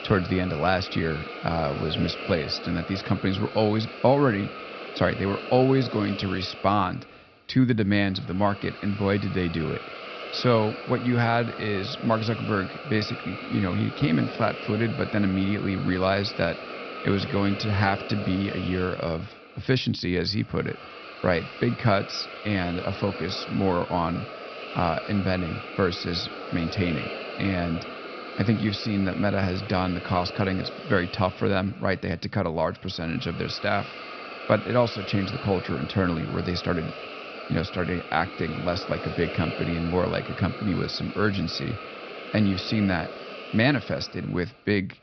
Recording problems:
high frequencies cut off; noticeable; nothing above 5.5 kHz
hiss; noticeable; throughout; 10 dB below the speech

